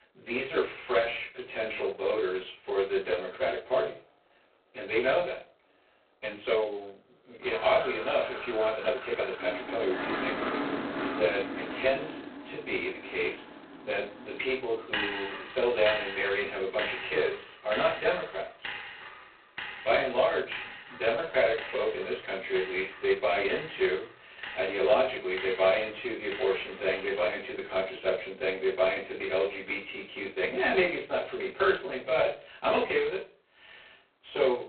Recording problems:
phone-call audio; poor line; nothing above 4 kHz
off-mic speech; far
room echo; slight; dies away in 0.3 s
traffic noise; loud; throughout; 9 dB below the speech
uneven, jittery; strongly; from 6 to 22 s

